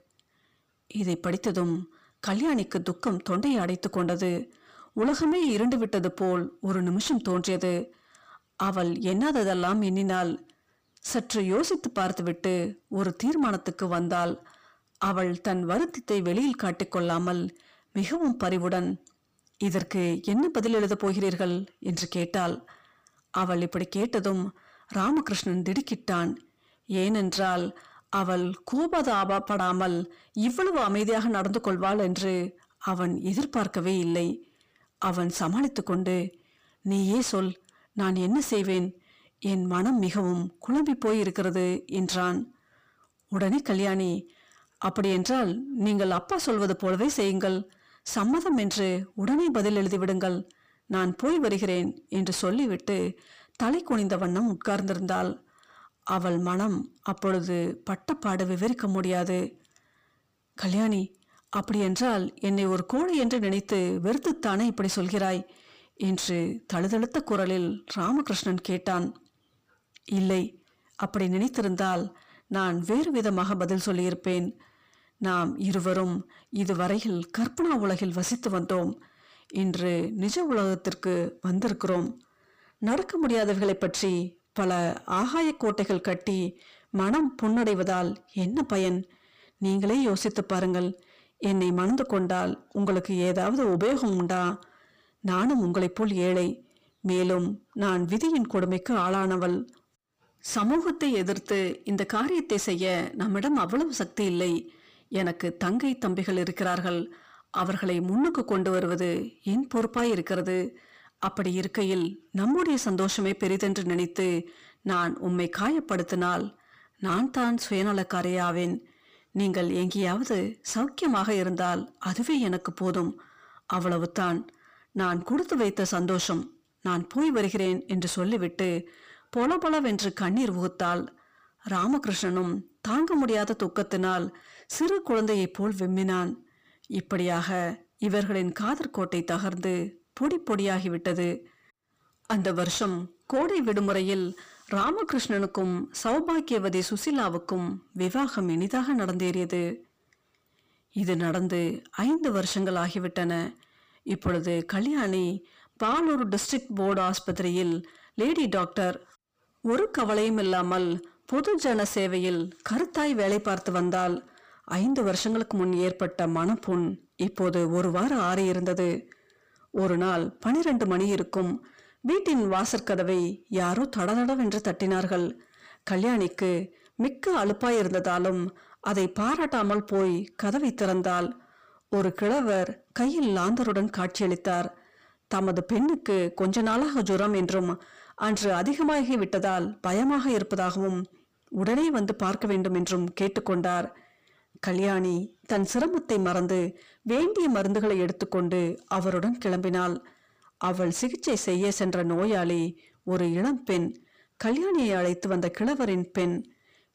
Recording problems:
distortion; slight; 10 dB below the speech

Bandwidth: 15 kHz